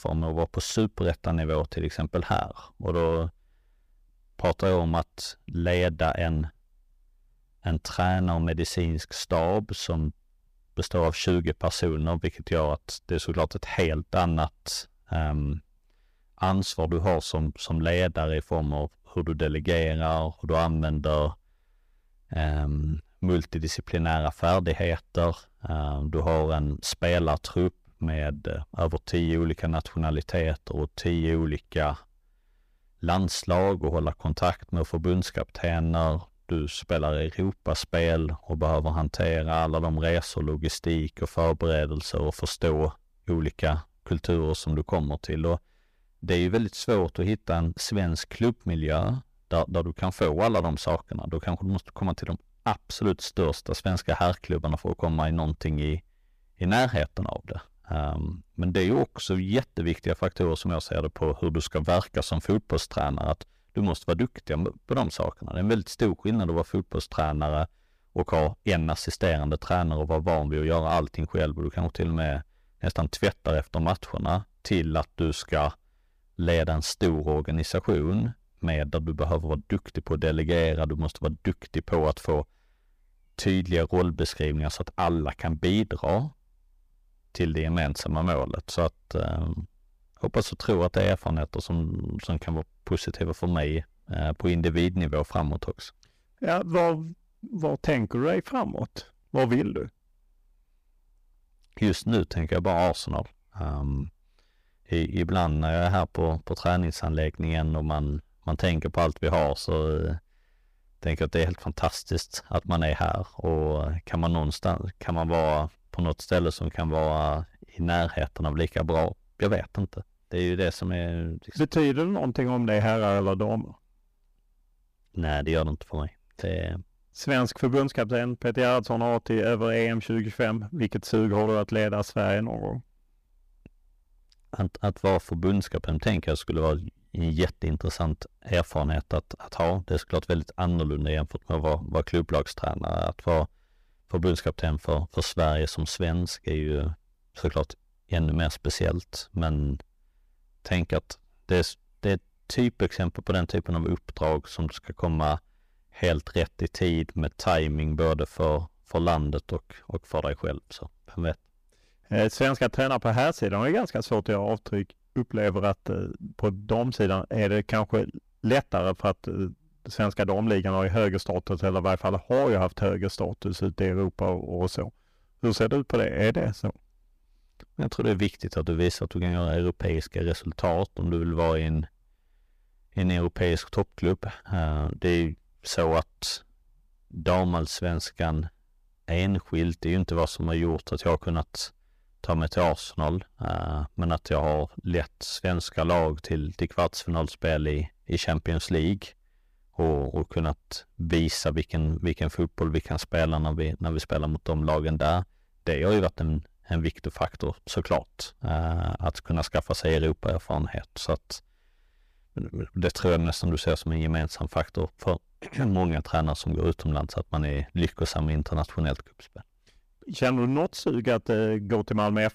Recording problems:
distortion; slight; 5% of the sound clipped

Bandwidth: 15 kHz